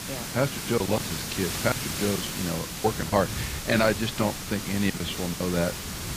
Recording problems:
garbled, watery; badly; nothing above 8 kHz
hiss; loud; throughout; 5 dB below the speech
wind noise on the microphone; occasional gusts; 20 dB below the speech
choppy; very; 8% of the speech affected

